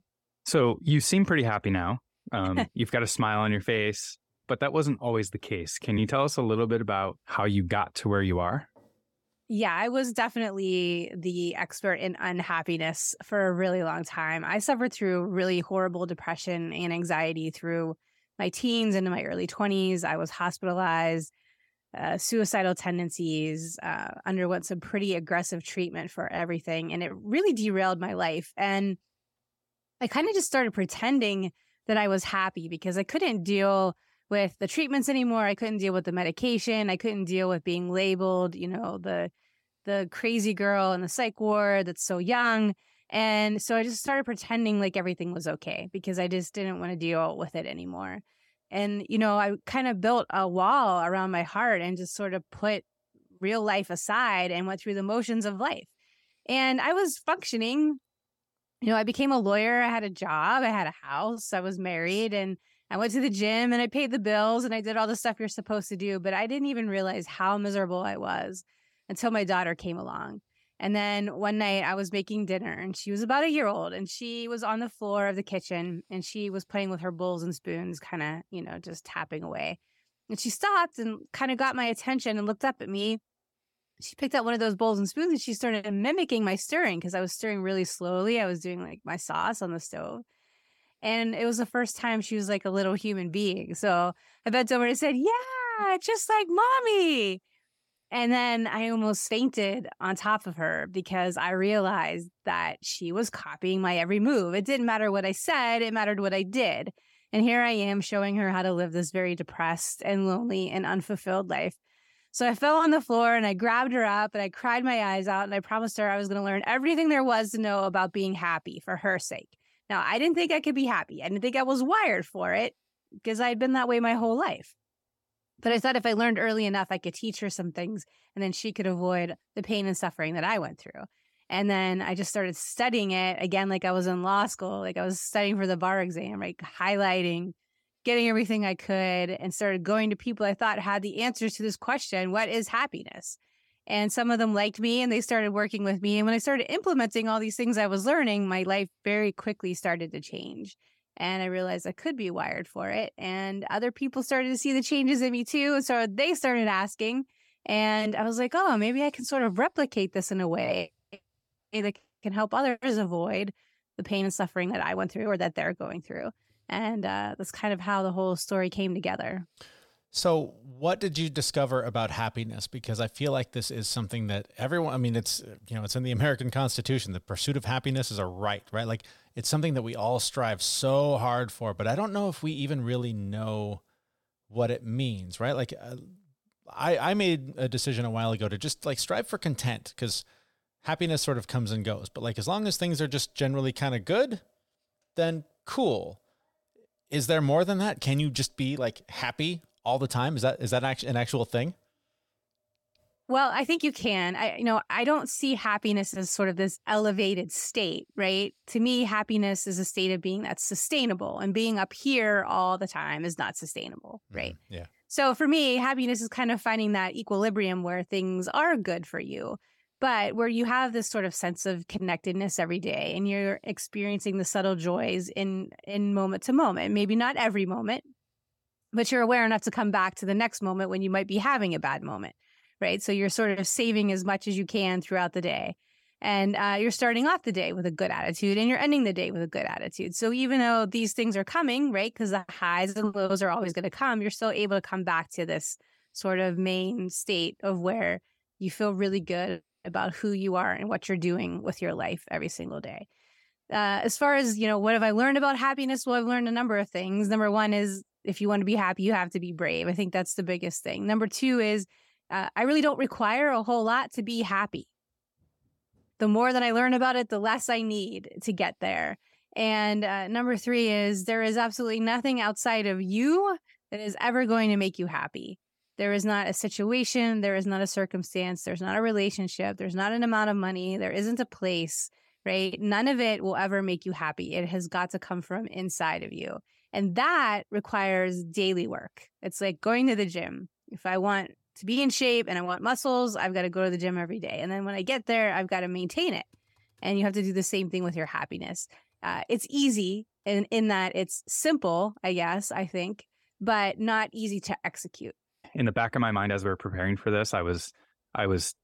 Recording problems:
none

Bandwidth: 17 kHz